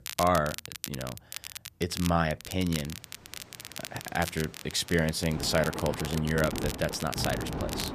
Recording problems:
rain or running water; loud; from 3 s on; 8 dB below the speech
crackle, like an old record; loud; 10 dB below the speech

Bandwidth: 14.5 kHz